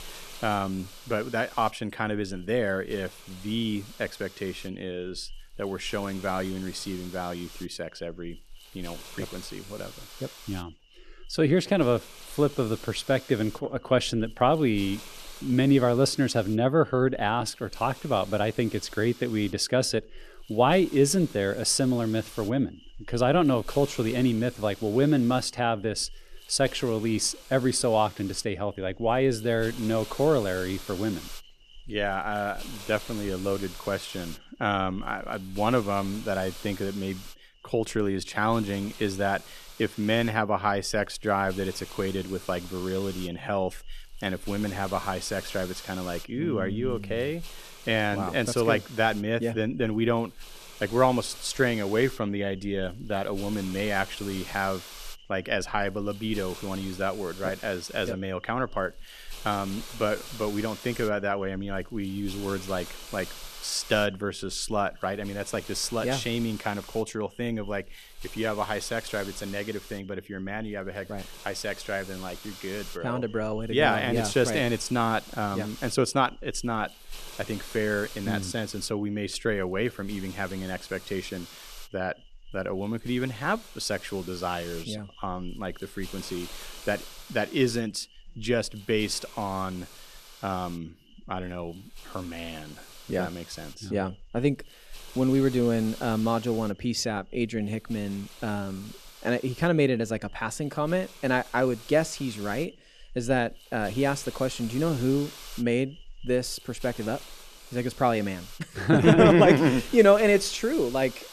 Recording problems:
hiss; noticeable; throughout; 15 dB below the speech

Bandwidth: 13.5 kHz